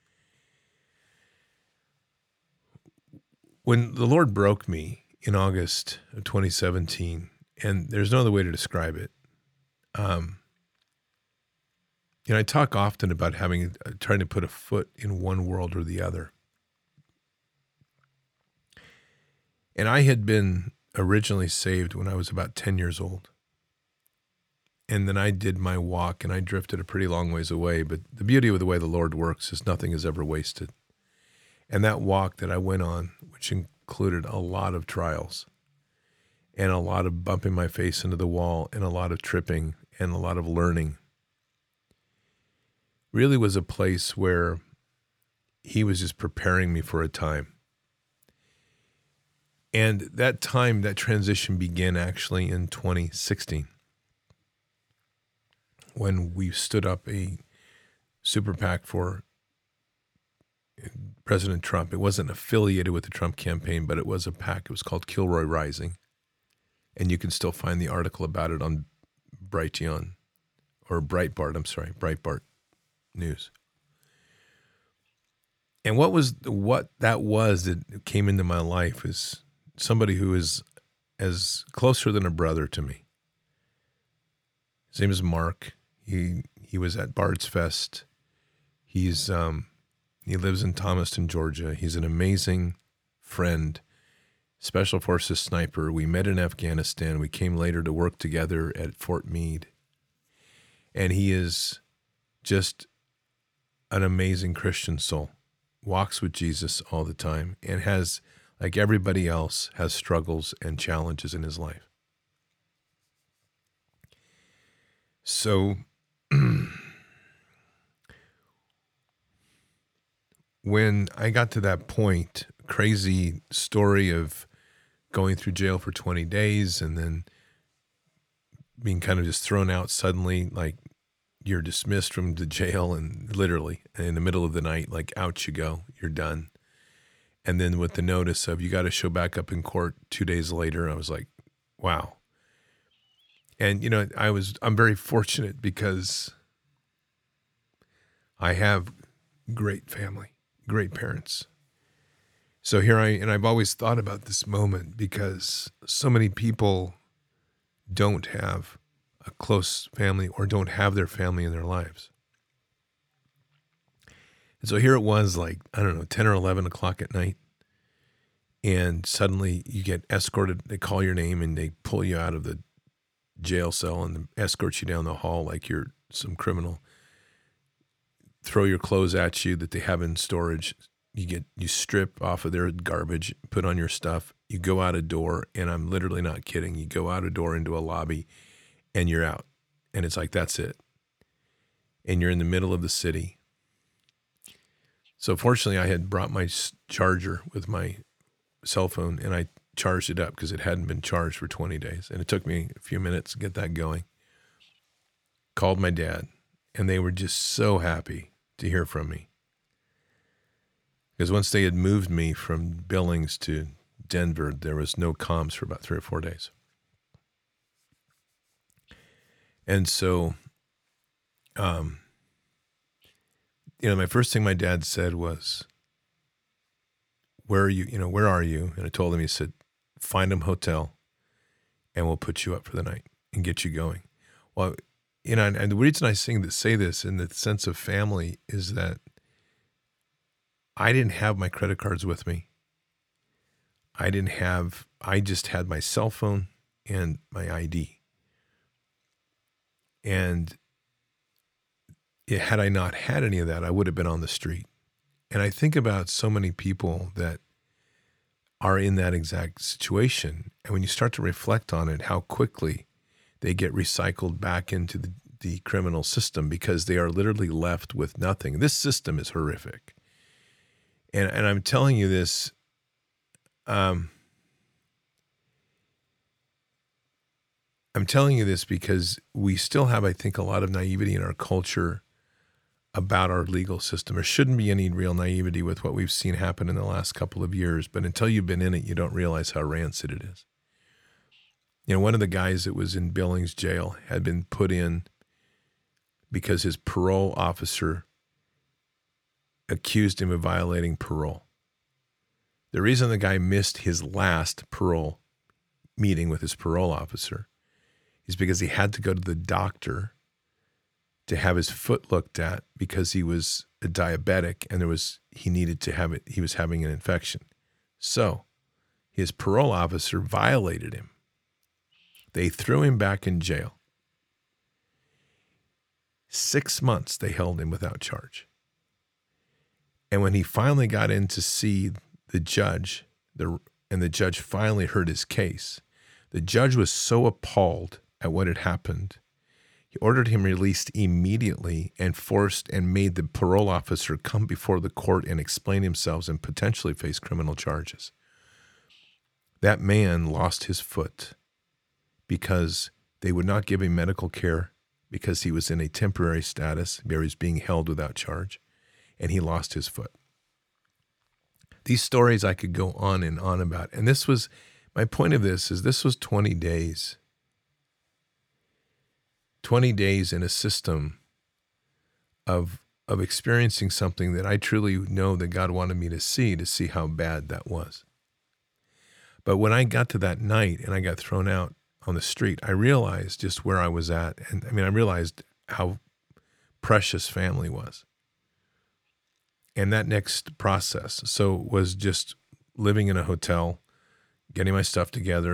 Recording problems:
abrupt cut into speech; at the end

